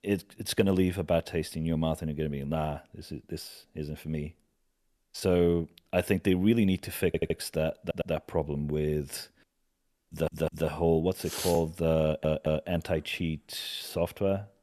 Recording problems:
audio stuttering; 4 times, first at 7 s

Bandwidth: 13.5 kHz